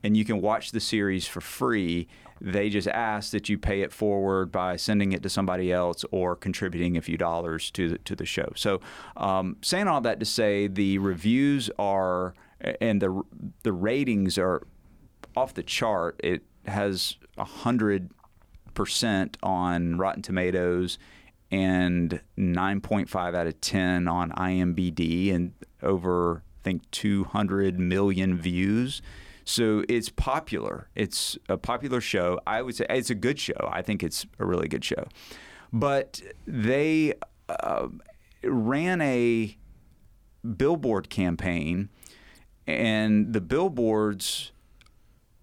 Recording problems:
none

